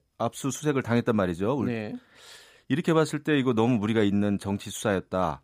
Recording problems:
none

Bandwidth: 15 kHz